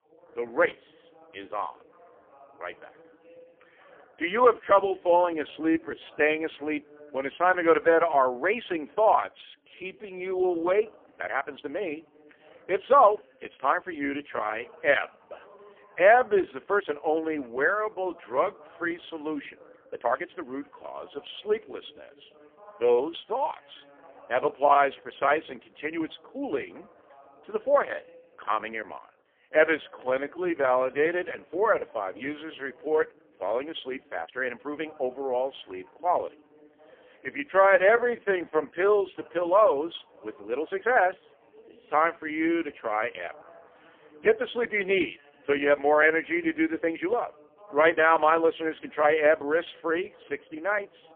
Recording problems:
phone-call audio; poor line; nothing above 3.5 kHz
voice in the background; faint; throughout; 30 dB below the speech
uneven, jittery; strongly; from 5 to 48 s

